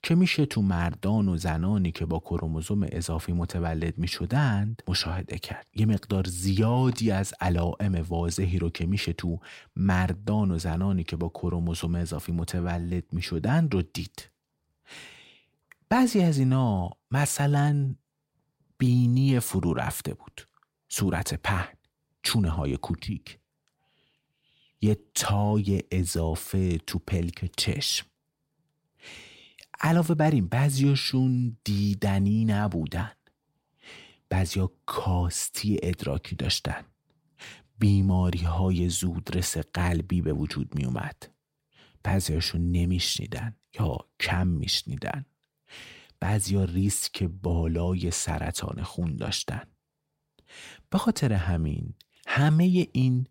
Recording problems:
none

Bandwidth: 16 kHz